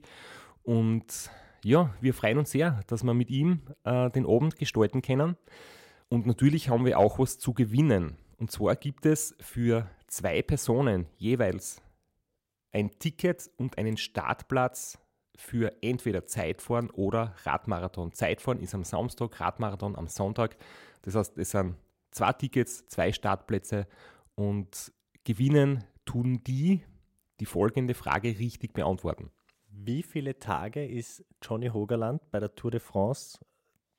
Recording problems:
none

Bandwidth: 16 kHz